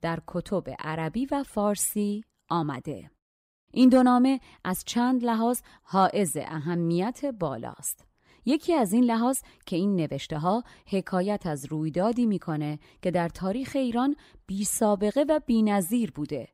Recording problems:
none

